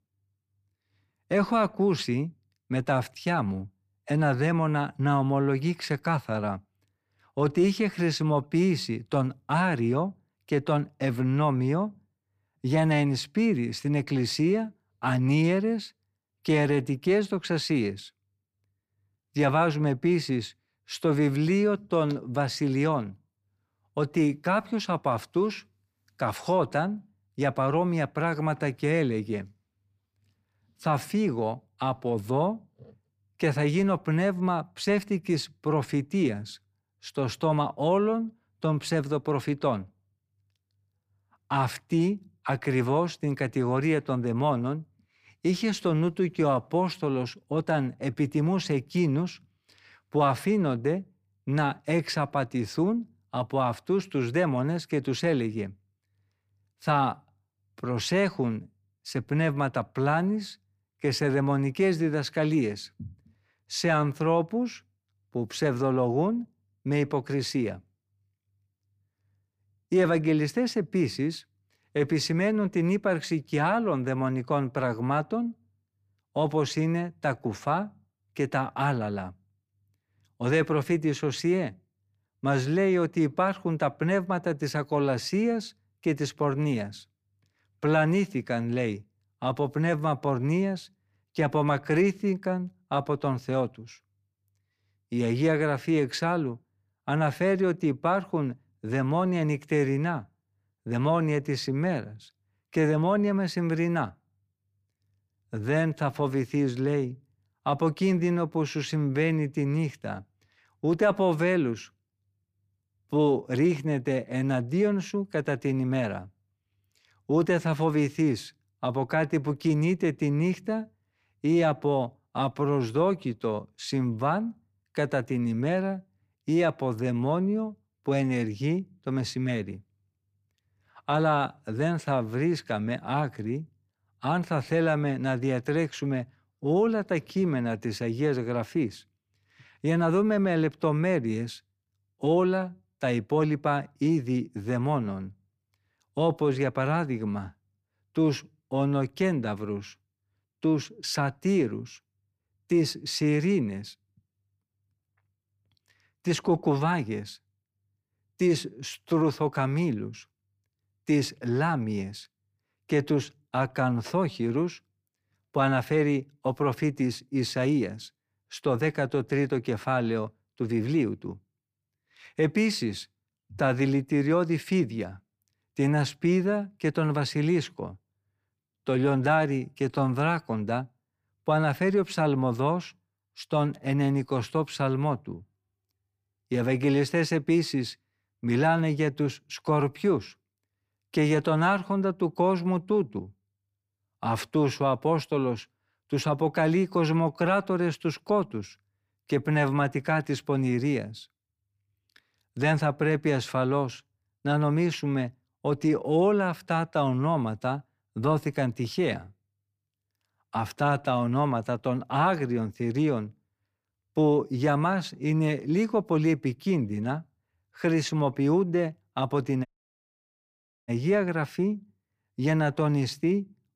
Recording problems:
audio cutting out; at 3:40 for 1 s

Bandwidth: 15 kHz